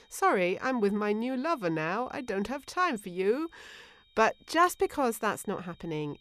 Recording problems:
high-pitched whine; faint; throughout; 4 kHz, 30 dB below the speech

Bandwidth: 14.5 kHz